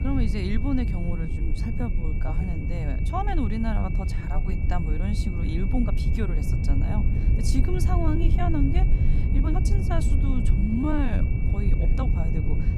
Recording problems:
low rumble; loud; throughout; 5 dB below the speech
high-pitched whine; noticeable; throughout; 2.5 kHz, 15 dB below the speech
uneven, jittery; strongly; from 1 to 12 s

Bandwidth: 15 kHz